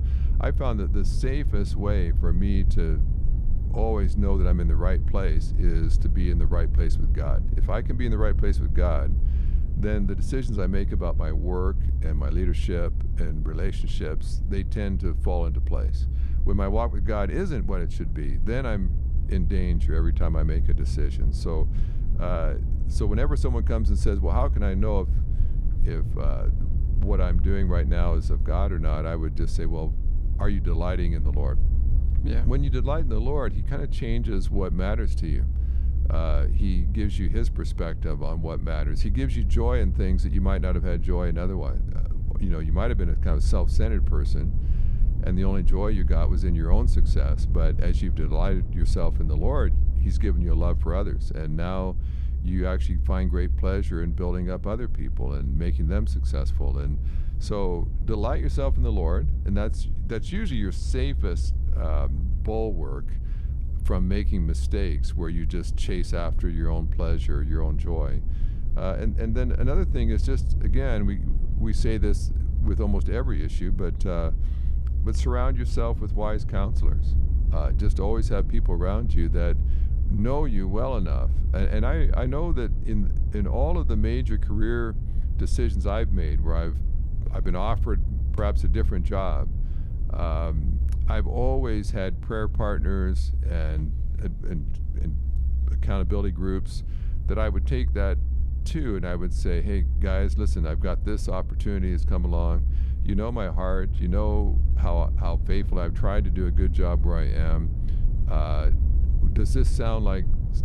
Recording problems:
low rumble; noticeable; throughout; 10 dB below the speech

